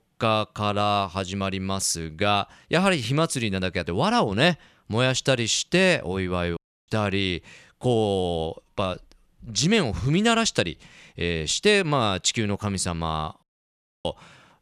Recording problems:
audio cutting out; at 6.5 s and at 13 s for 0.5 s

